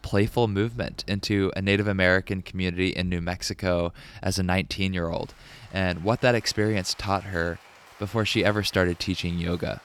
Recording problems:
rain or running water; faint; throughout; 25 dB below the speech

